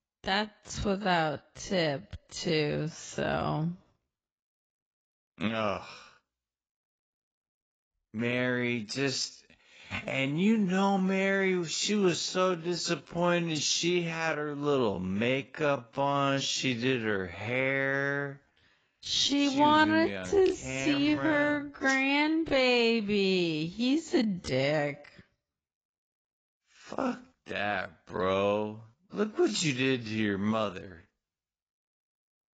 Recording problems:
garbled, watery; badly; nothing above 7.5 kHz
wrong speed, natural pitch; too slow; 0.5 times normal speed

